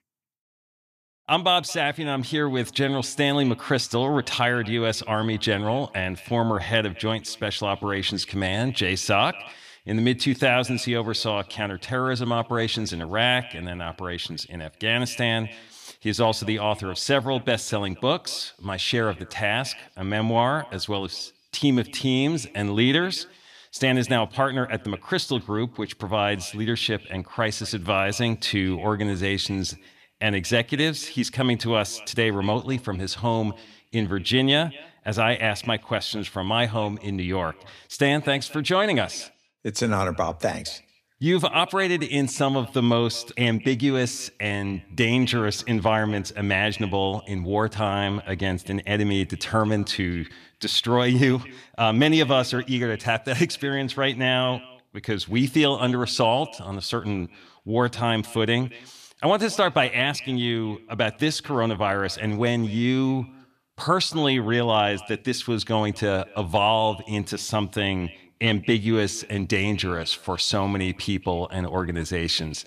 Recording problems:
echo of what is said; faint; throughout; 230 ms later, 20 dB below the speech

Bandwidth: 14.5 kHz